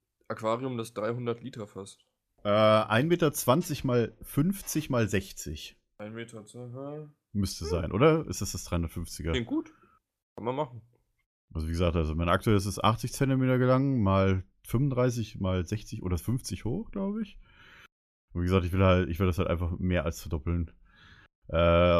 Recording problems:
abrupt cut into speech; at the end

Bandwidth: 14.5 kHz